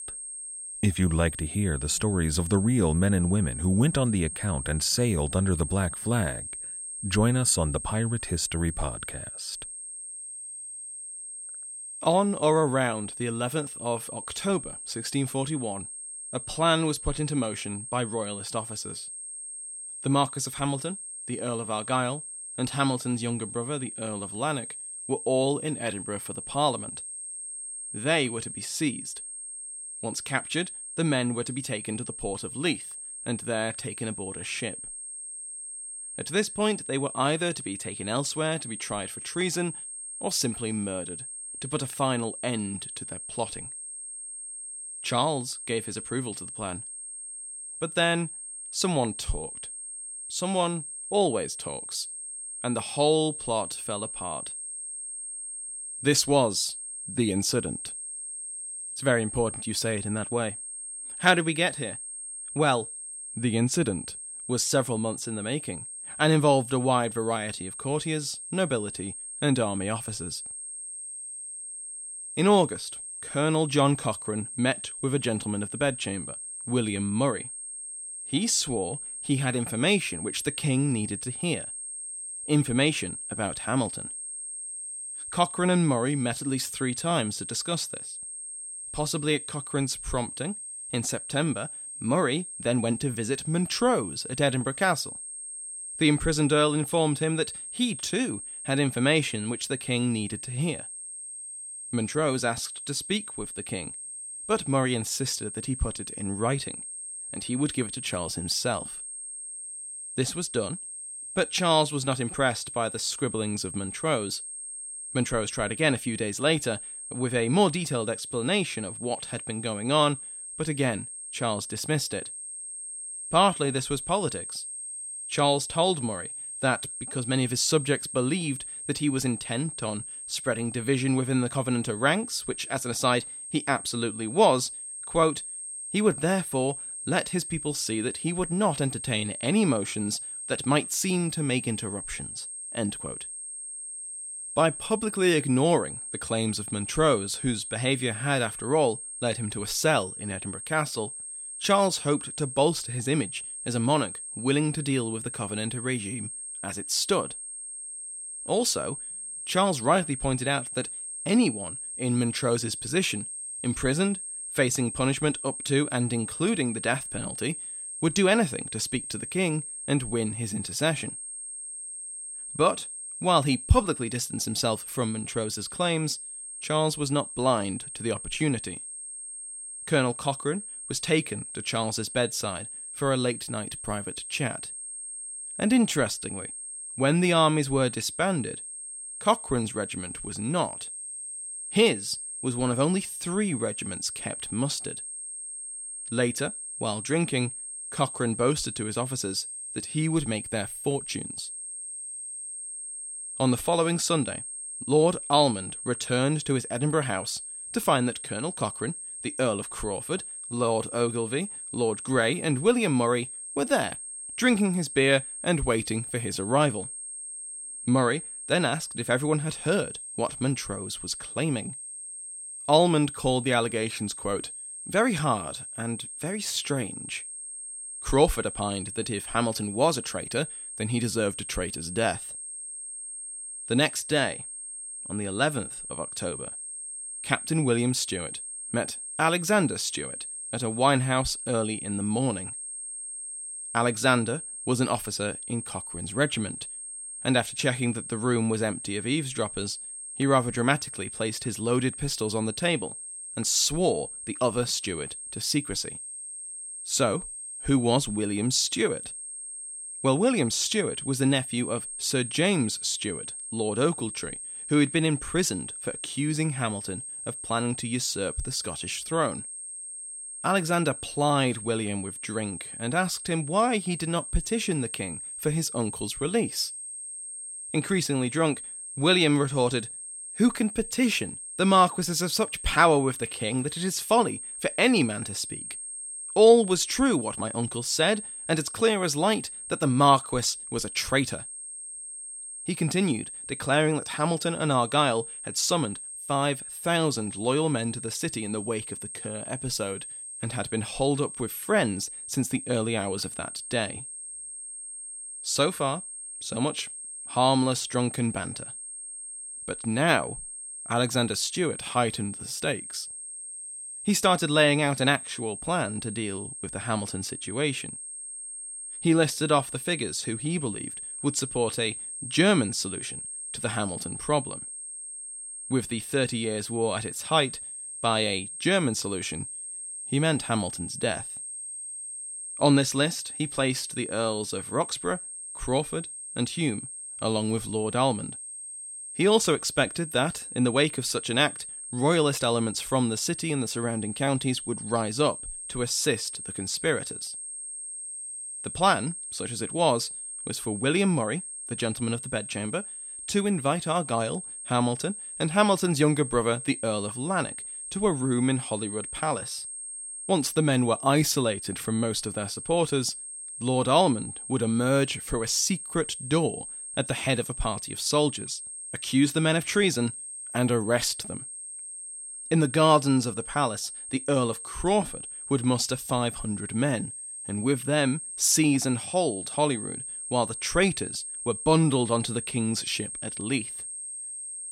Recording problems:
high-pitched whine; loud; throughout; 8.5 kHz, 8 dB below the speech

